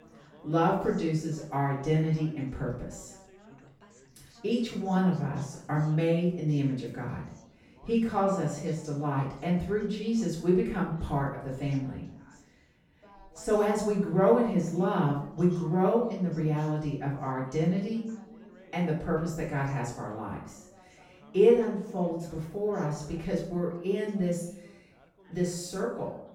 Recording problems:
off-mic speech; far
room echo; noticeable; dies away in 0.5 s
background chatter; faint; throughout; 3 voices, 25 dB below the speech

